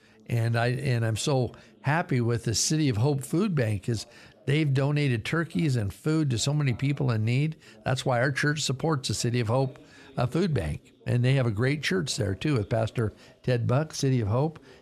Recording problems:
background chatter; faint; throughout; 2 voices, 30 dB below the speech

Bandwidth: 13.5 kHz